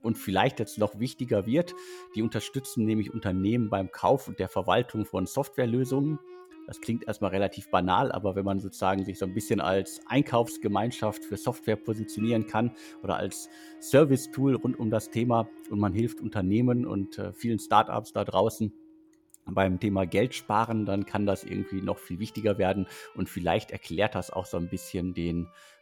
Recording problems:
background music; noticeable; throughout; 20 dB below the speech

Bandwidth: 17 kHz